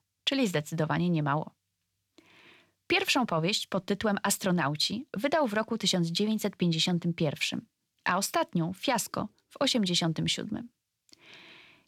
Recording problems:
none

